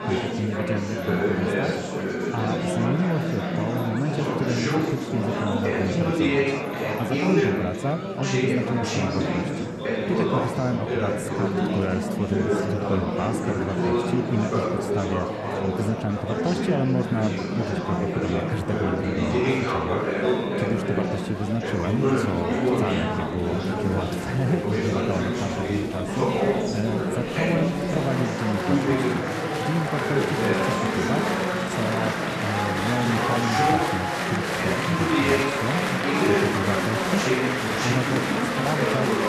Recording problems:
murmuring crowd; very loud; throughout; 5 dB above the speech

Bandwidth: 13.5 kHz